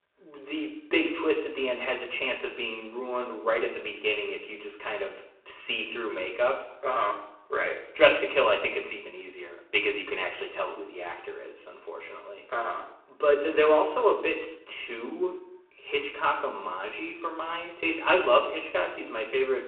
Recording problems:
phone-call audio; poor line
room echo; slight; dies away in 0.7 s
off-mic speech; somewhat distant

